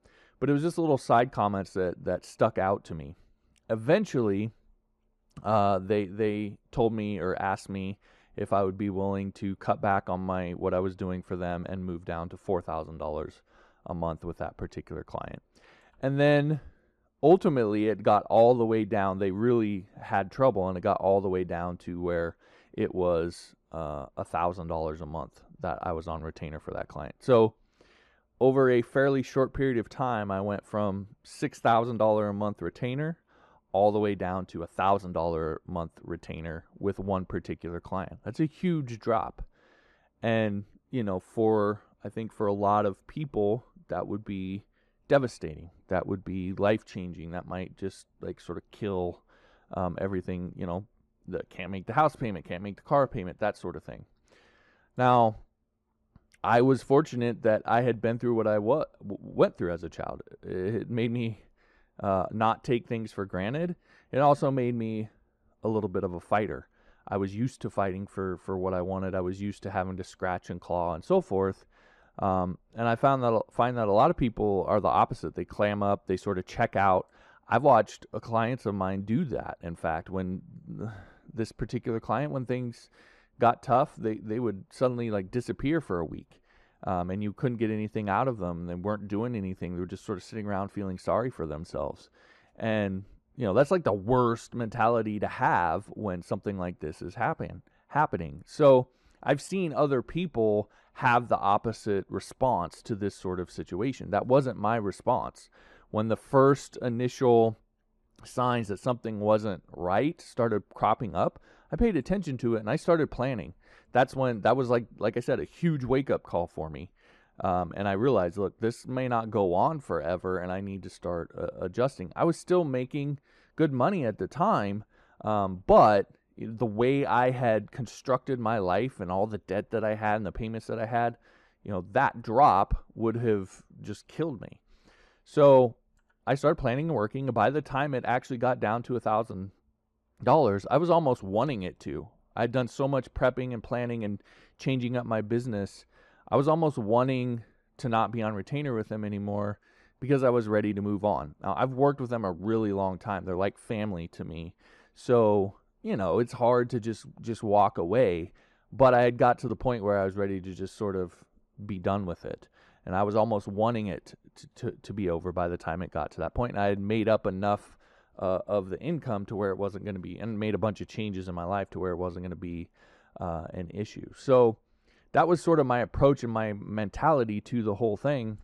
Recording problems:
muffled; very; fading above 2 kHz

